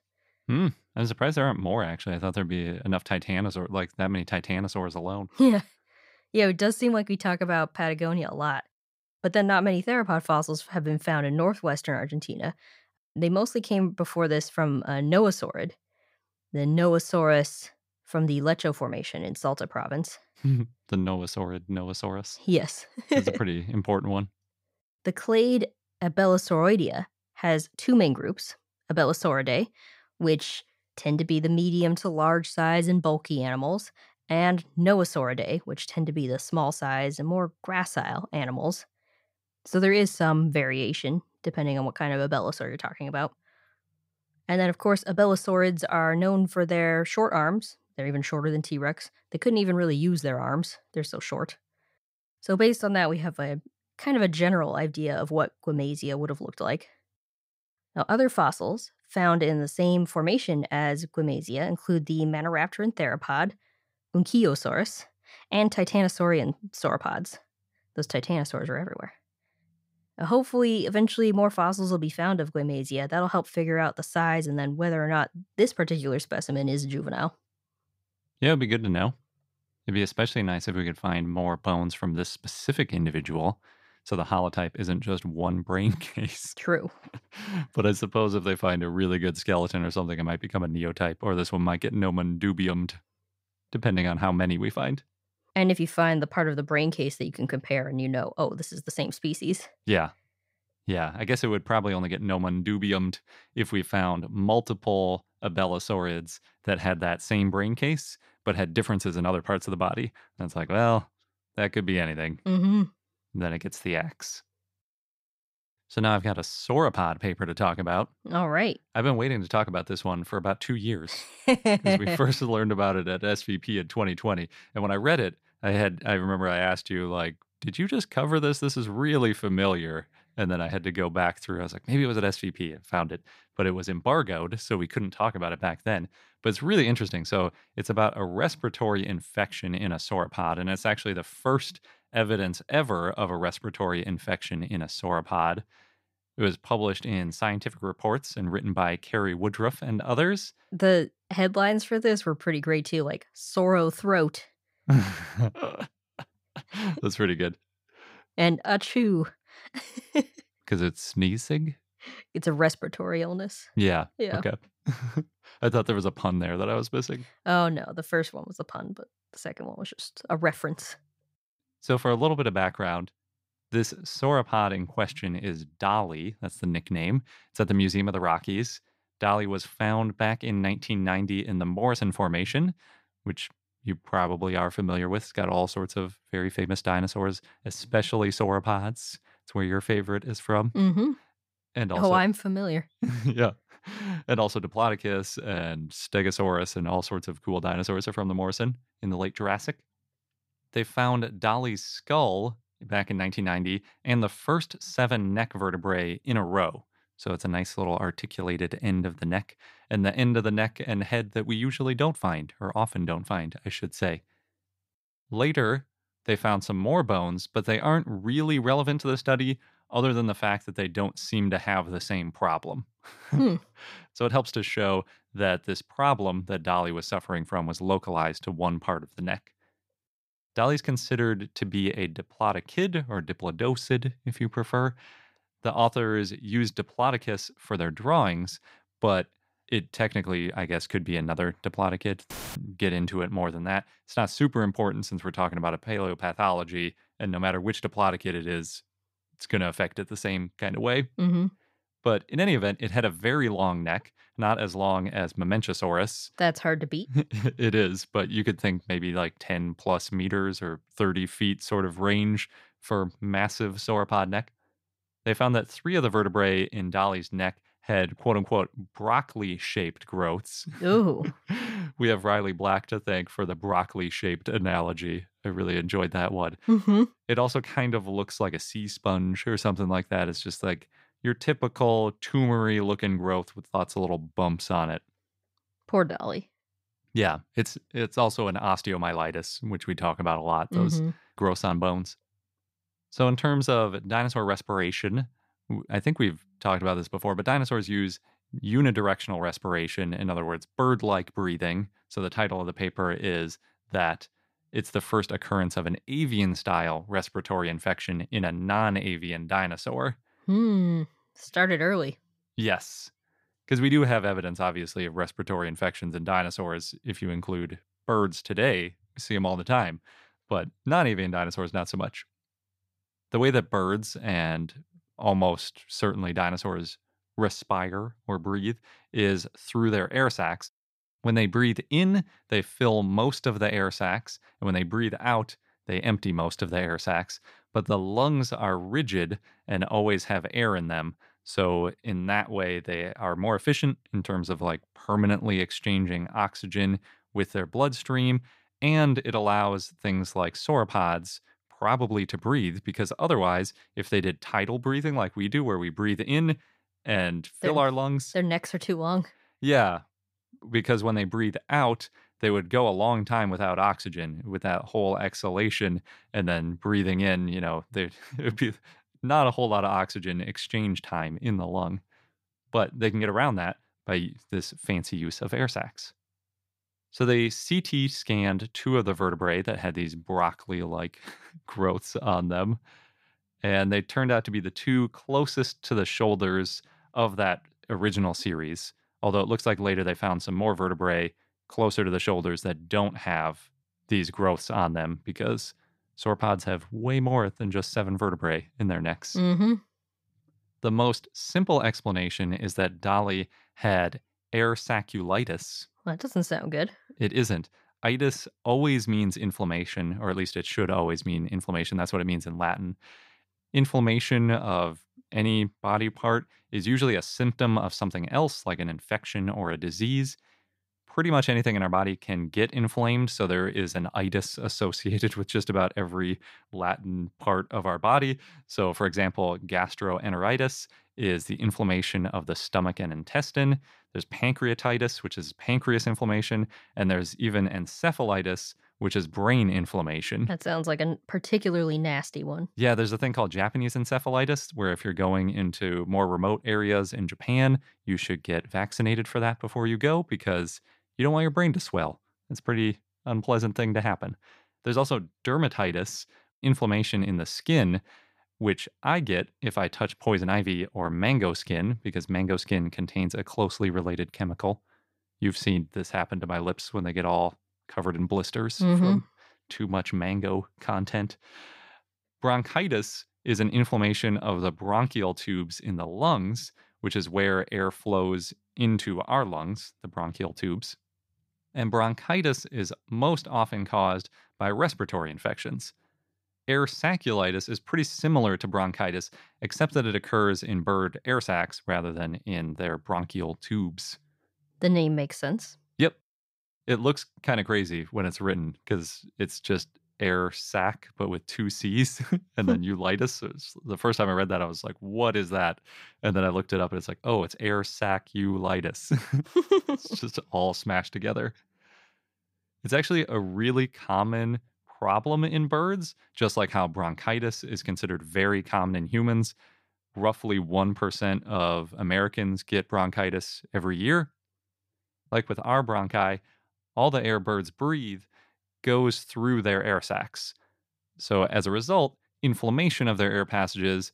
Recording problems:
audio cutting out; filled with static; at 4:02

